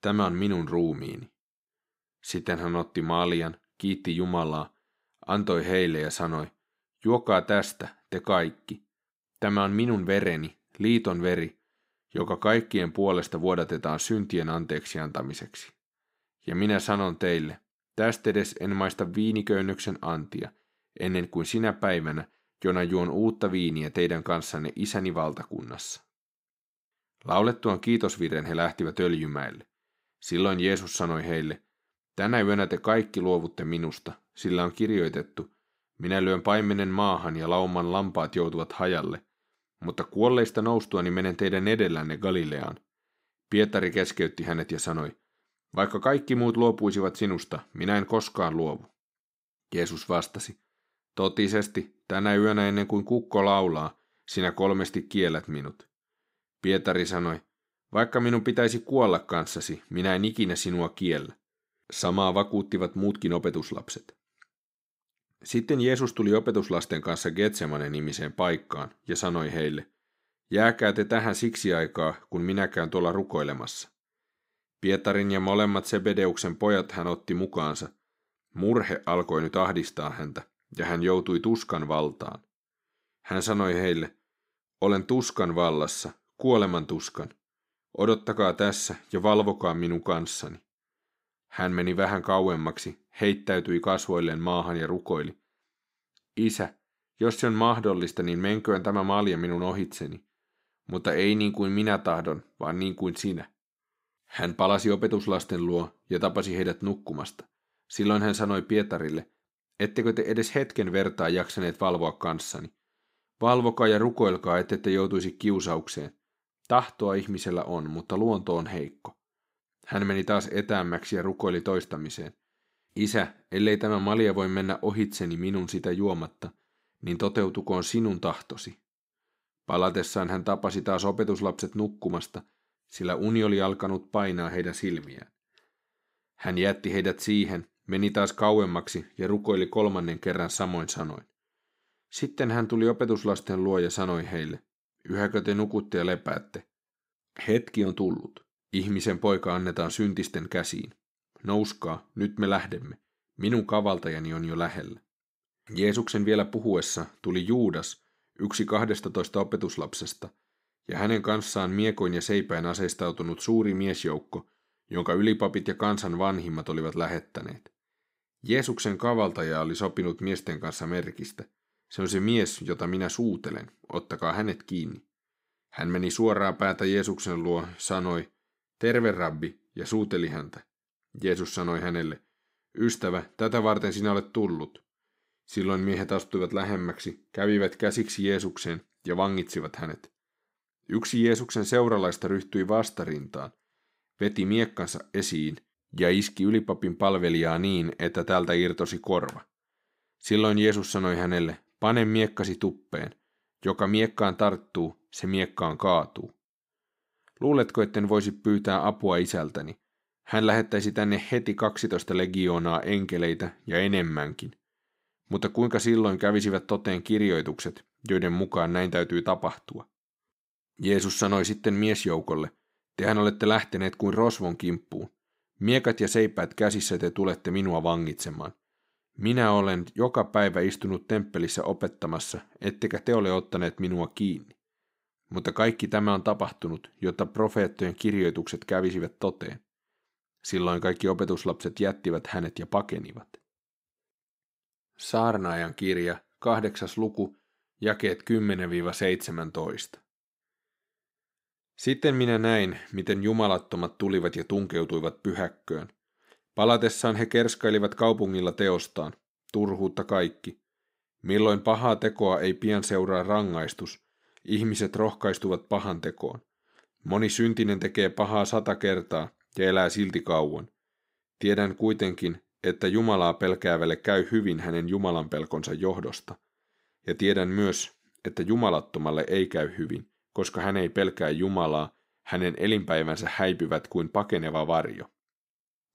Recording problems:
none

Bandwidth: 15.5 kHz